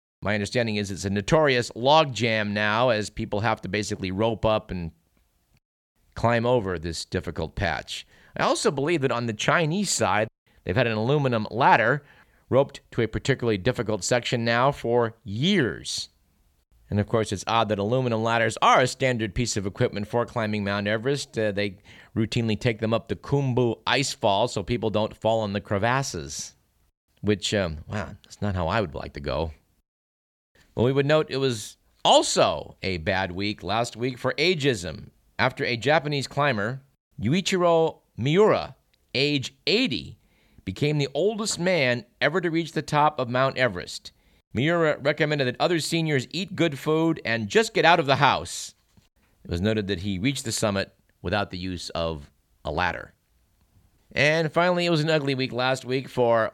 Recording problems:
none

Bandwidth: 17.5 kHz